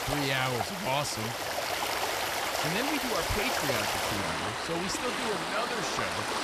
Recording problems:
rain or running water; very loud; throughout; 3 dB above the speech

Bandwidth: 14.5 kHz